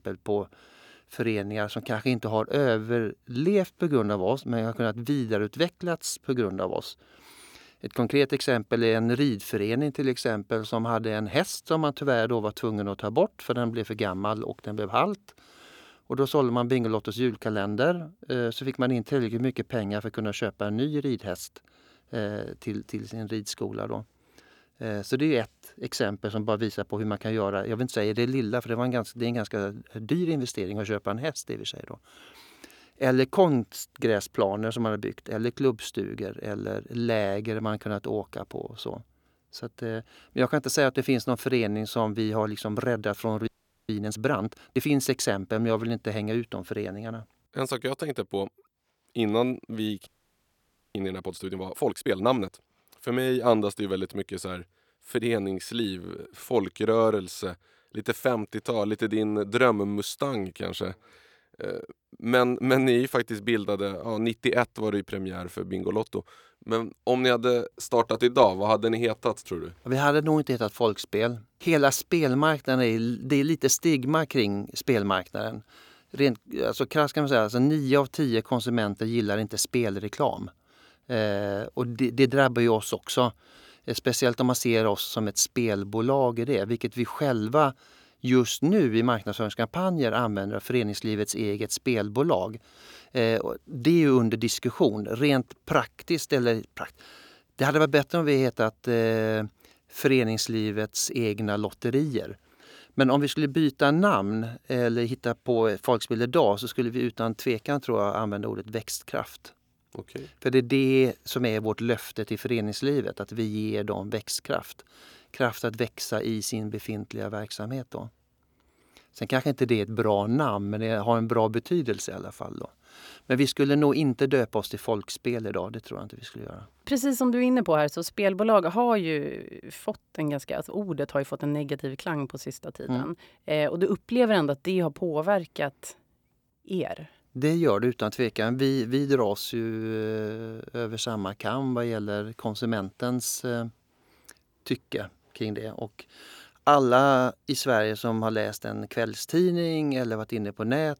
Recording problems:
audio freezing; at 43 s and at 50 s for 1 s

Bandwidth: 18.5 kHz